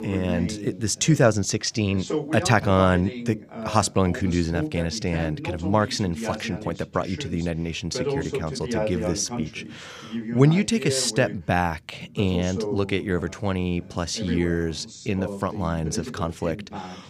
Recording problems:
voice in the background; loud; throughout; 8 dB below the speech

